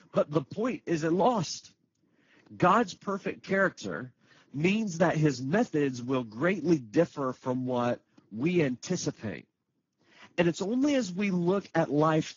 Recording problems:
garbled, watery; badly
high frequencies cut off; noticeable; nothing above 7 kHz

